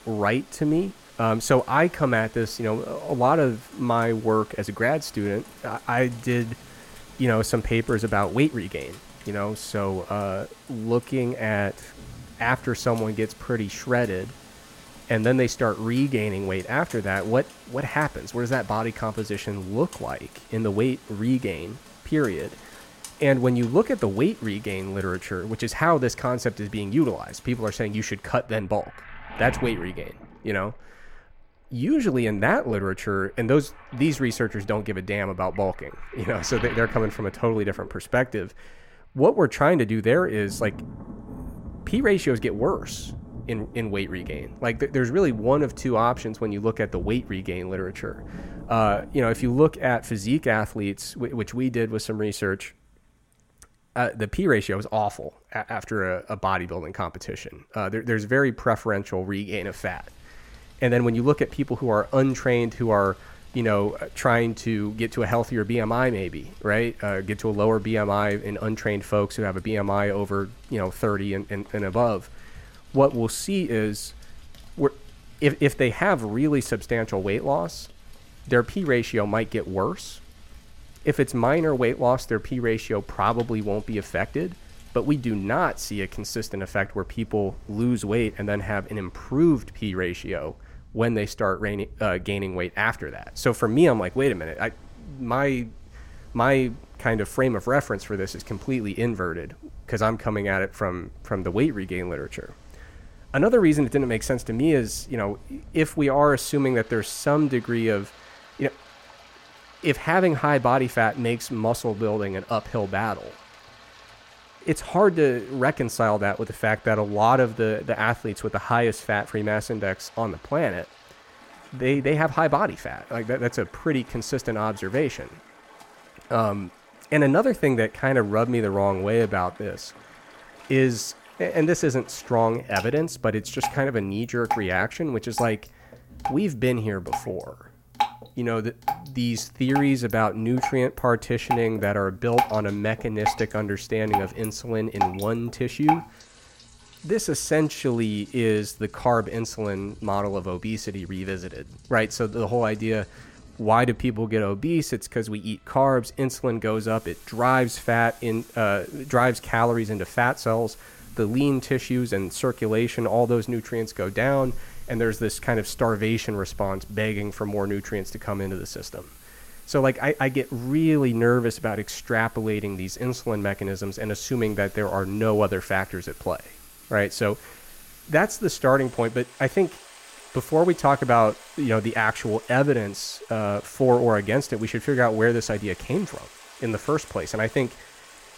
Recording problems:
rain or running water; noticeable; throughout; 15 dB below the speech

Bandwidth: 16.5 kHz